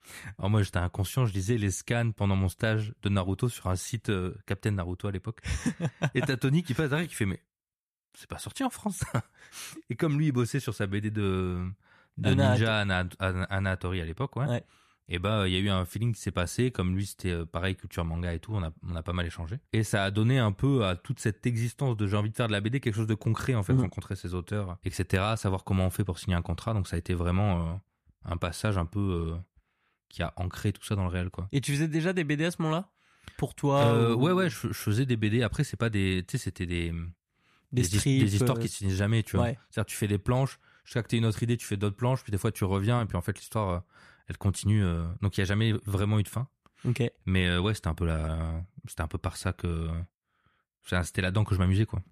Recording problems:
none

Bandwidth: 14.5 kHz